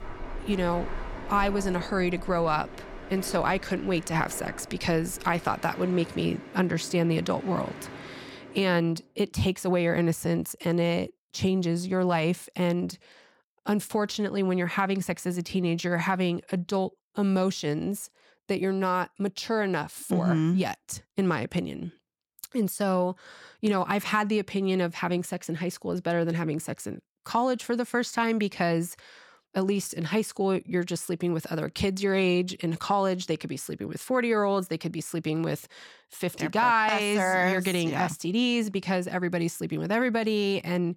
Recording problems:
train or aircraft noise; noticeable; until 8.5 s; 15 dB below the speech

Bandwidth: 18 kHz